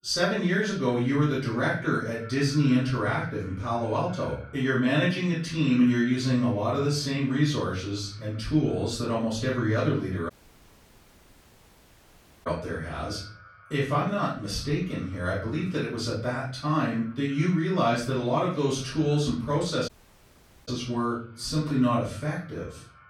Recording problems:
off-mic speech; far
room echo; noticeable; dies away in 0.5 s
echo of what is said; faint; throughout; 330 ms later, 25 dB below the speech
audio cutting out; at 10 s for 2 s and at 20 s for 1 s

